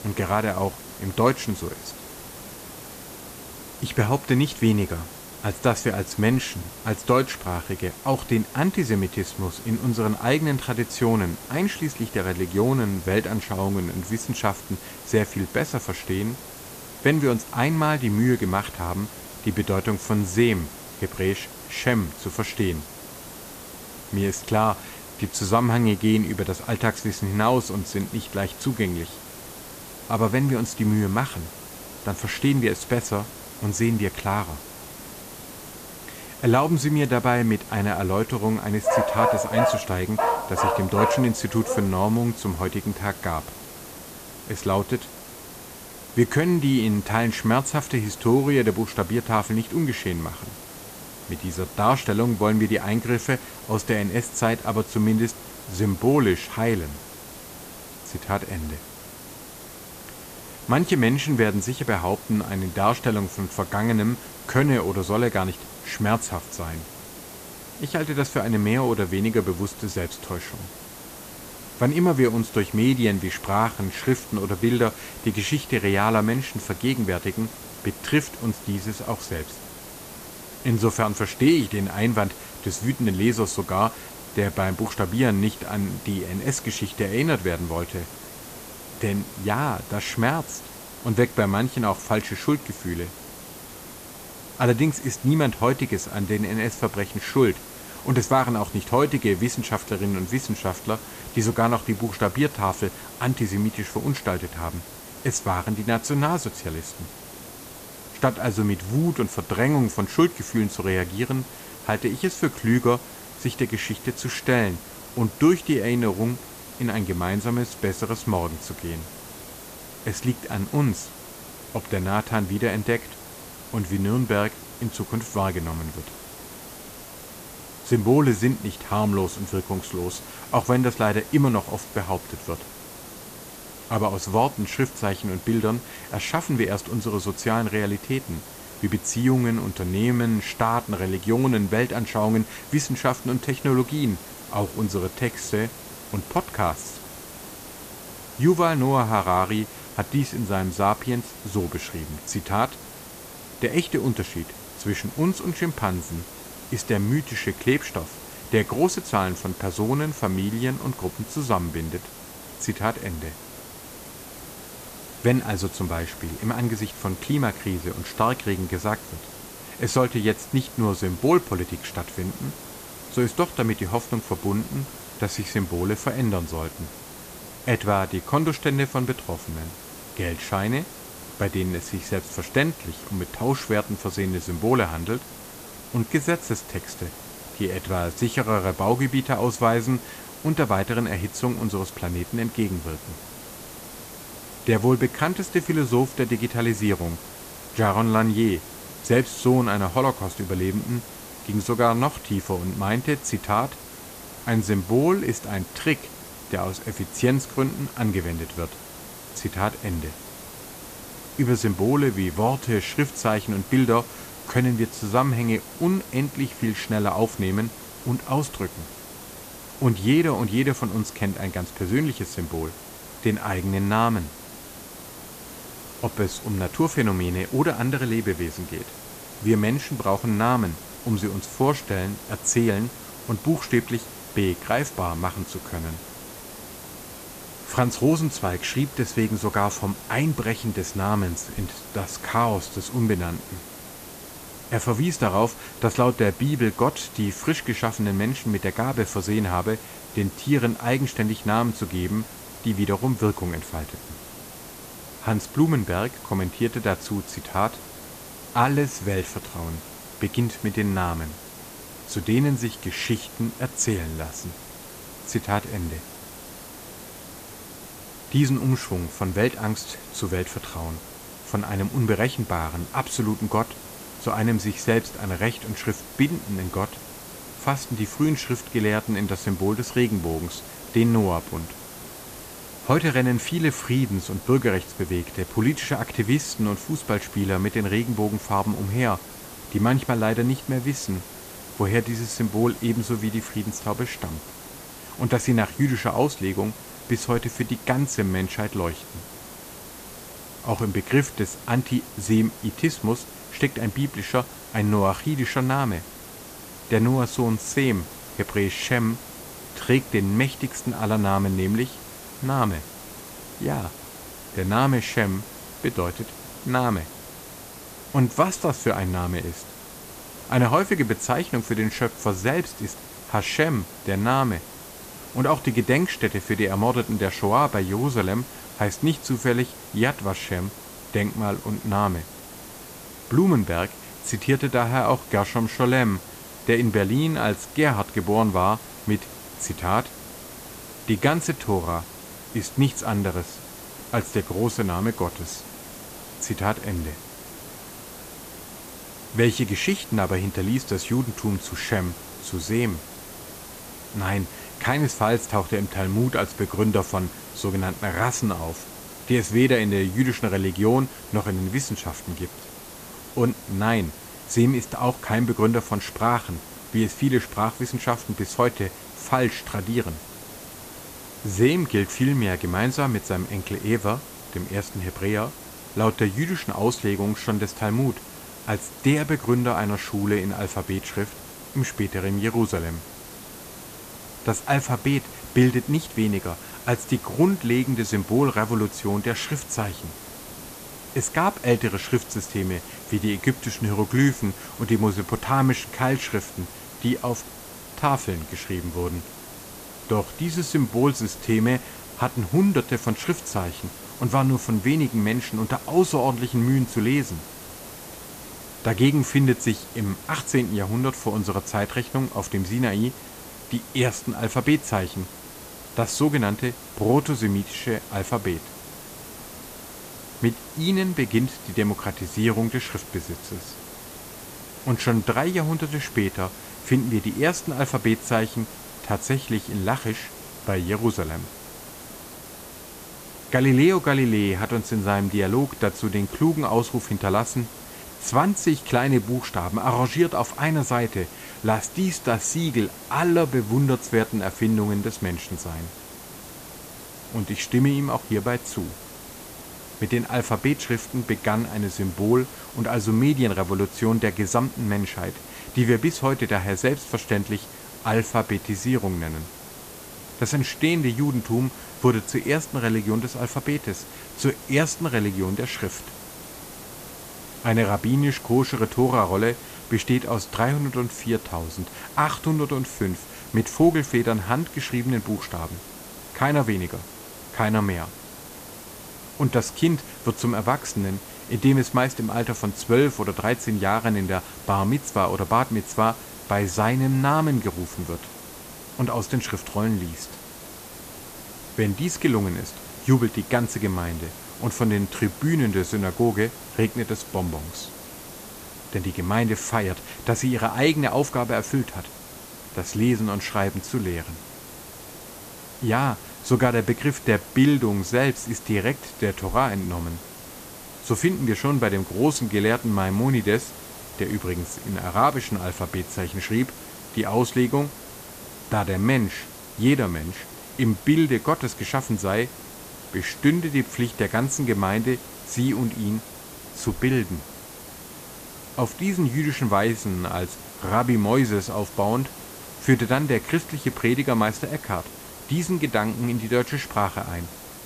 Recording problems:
hiss; noticeable; throughout; 15 dB below the speech
dog barking; loud; from 39 to 42 s; peak 3 dB above the speech

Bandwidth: 14.5 kHz